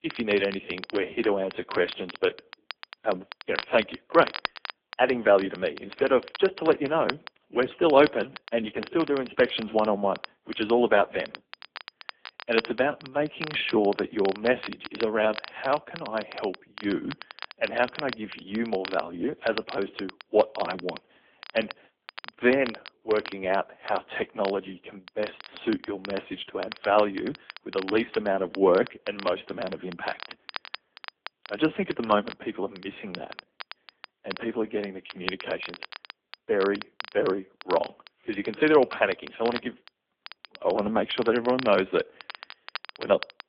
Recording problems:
phone-call audio; nothing above 3.5 kHz
garbled, watery; slightly
crackle, like an old record; noticeable; 15 dB below the speech

